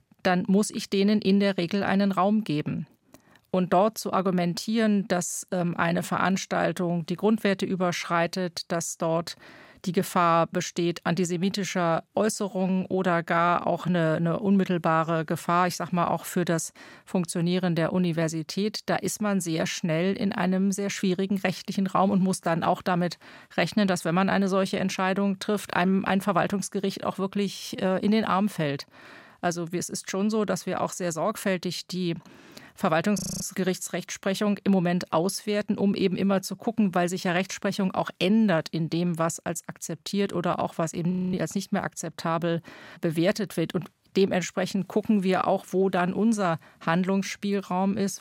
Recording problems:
audio freezing; at 33 s and at 41 s

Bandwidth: 16 kHz